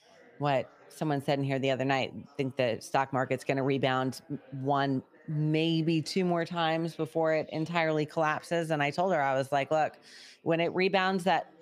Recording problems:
background chatter; faint; throughout; 4 voices, 30 dB below the speech

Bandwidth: 15 kHz